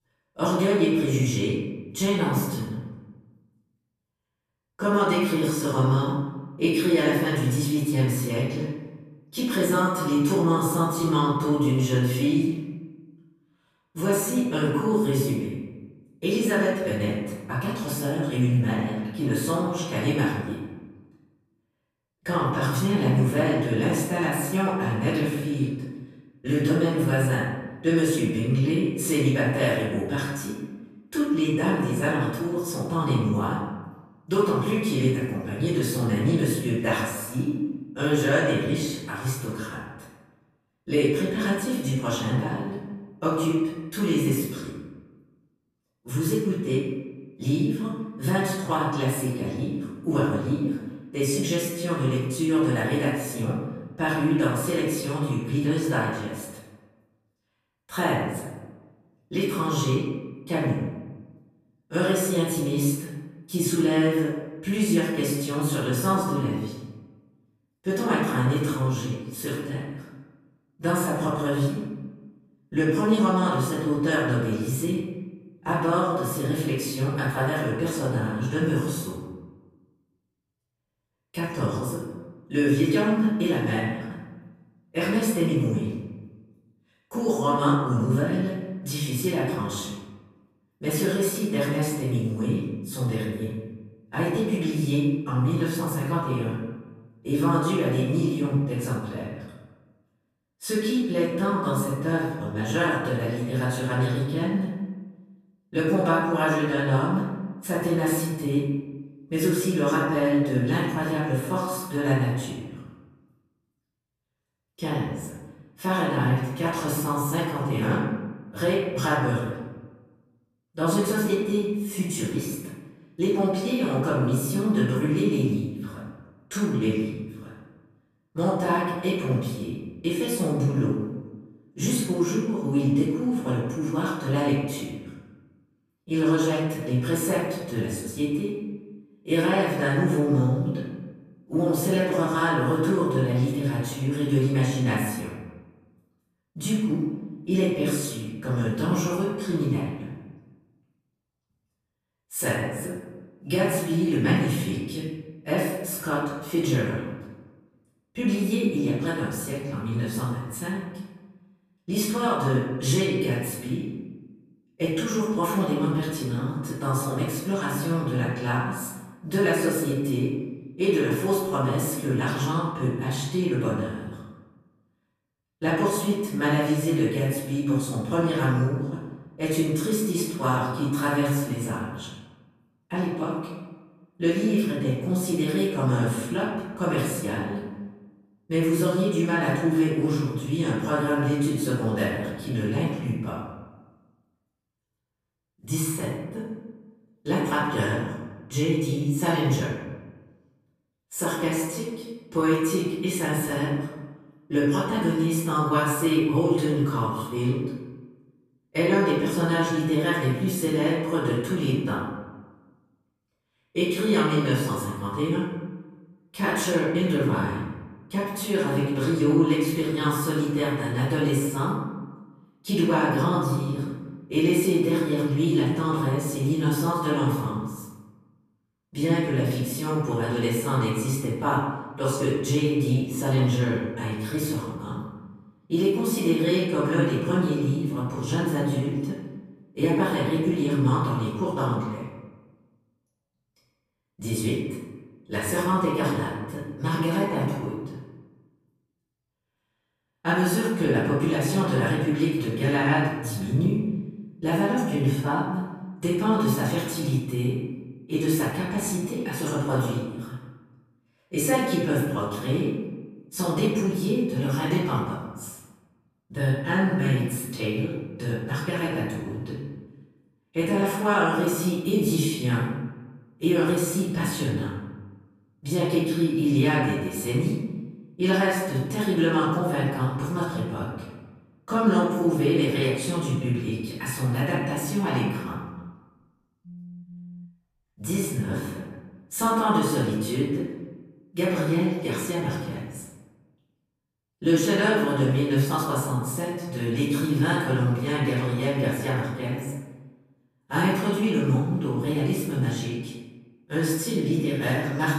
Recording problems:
off-mic speech; far
room echo; noticeable; dies away in 1 s
phone ringing; faint; from 4:46 to 4:48; peak 15 dB below the speech

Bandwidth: 14.5 kHz